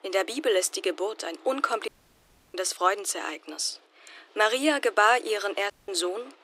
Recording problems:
thin; very; fading below 300 Hz
machinery noise; faint; throughout; 30 dB below the speech
audio cutting out; at 2 s for 0.5 s and at 5.5 s

